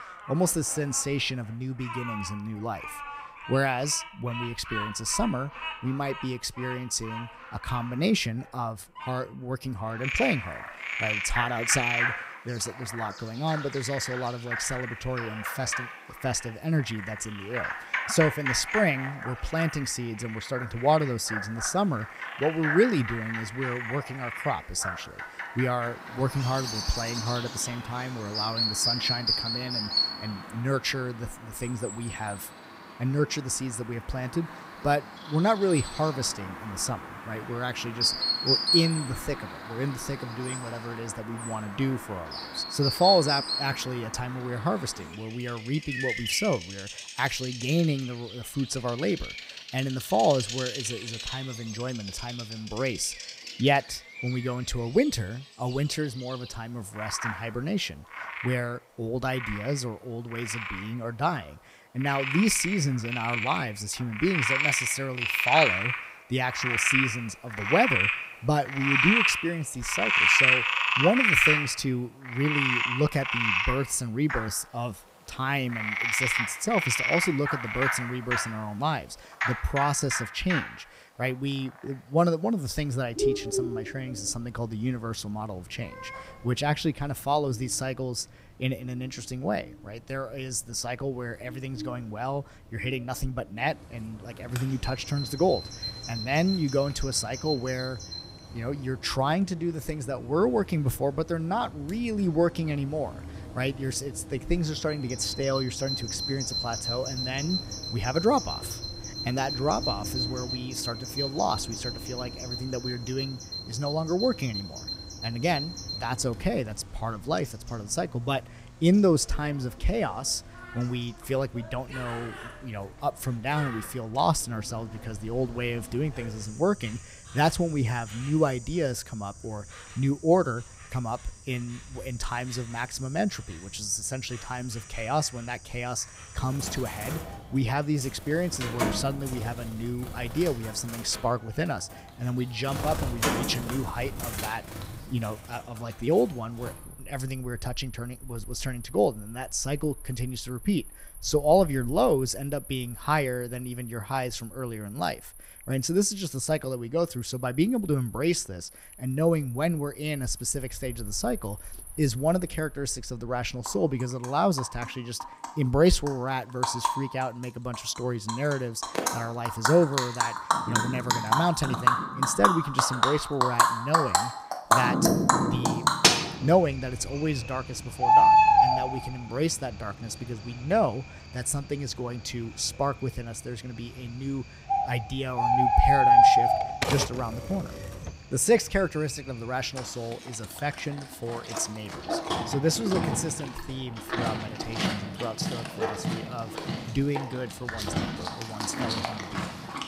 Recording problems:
animal sounds; very loud; throughout; 1 dB above the speech
keyboard typing; loud; from 3:07 to 3:08; peak 1 dB above the speech

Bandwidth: 15.5 kHz